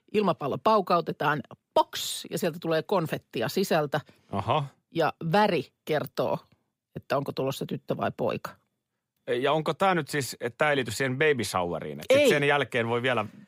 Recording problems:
none

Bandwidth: 15.5 kHz